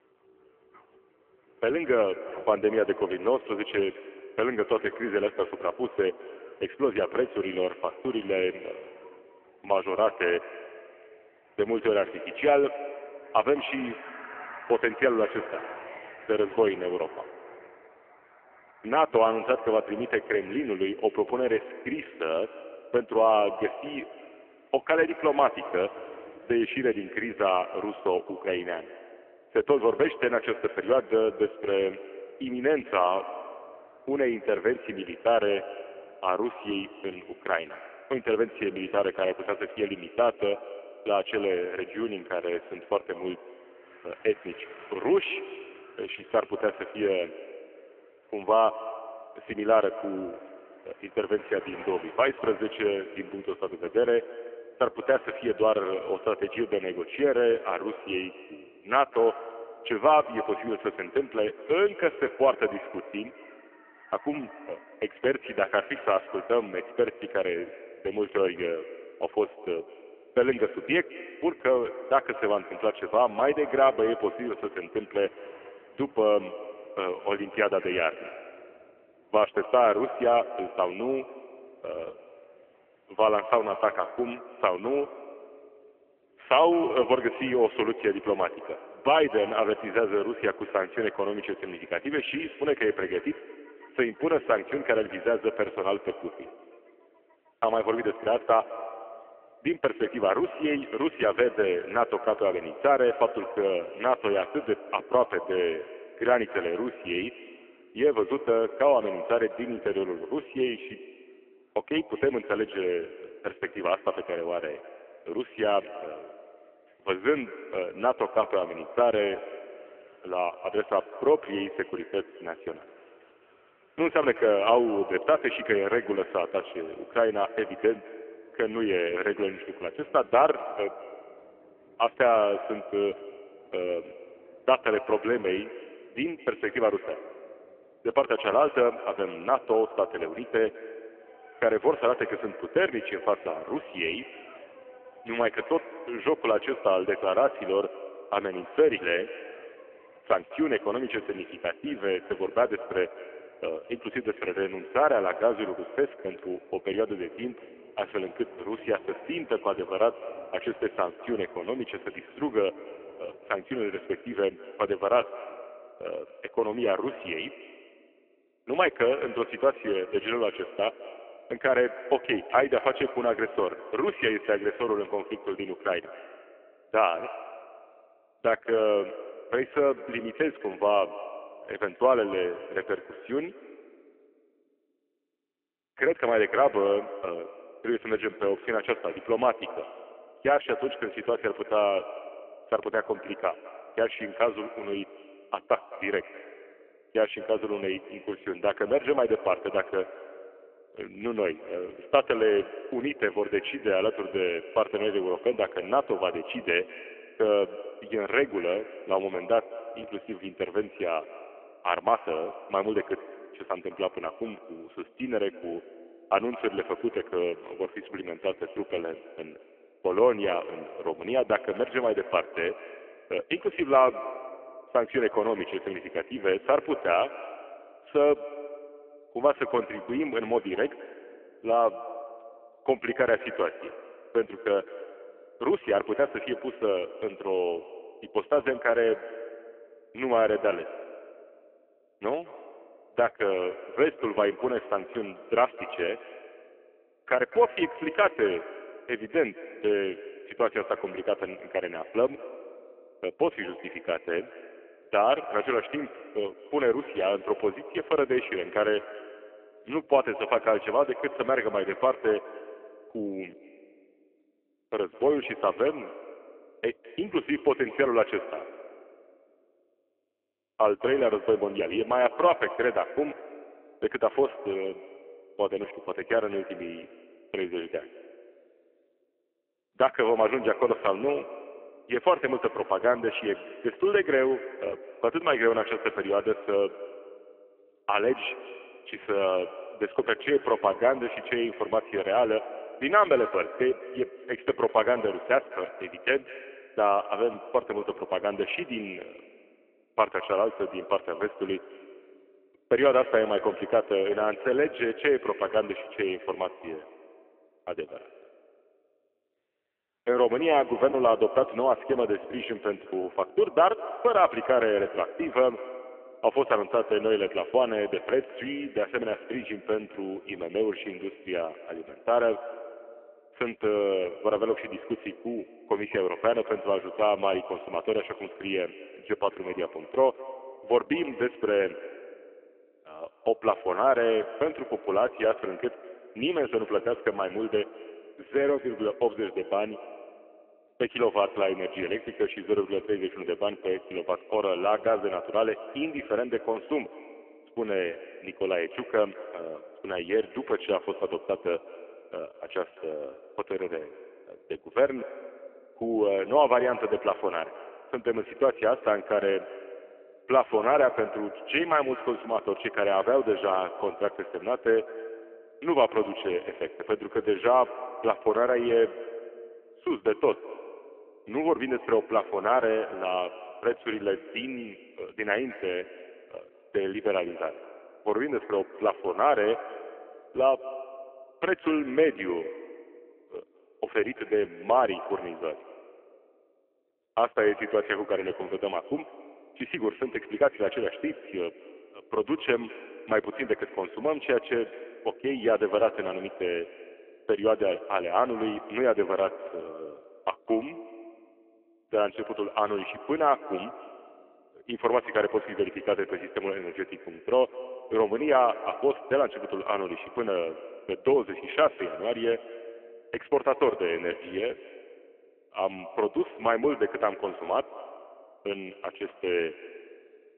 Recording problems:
phone-call audio; poor line; nothing above 3 kHz
echo of what is said; noticeable; throughout; 210 ms later, 15 dB below the speech
traffic noise; faint; until 2:45; 25 dB below the speech
choppy; occasionally; from 5:11 to 5:13; 3% of the speech affected

